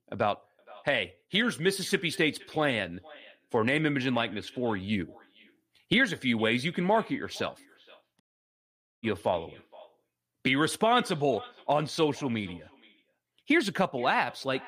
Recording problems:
echo of what is said; faint; throughout; 470 ms later, 20 dB below the speech
audio cutting out; at 8 s for 1 s

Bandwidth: 15 kHz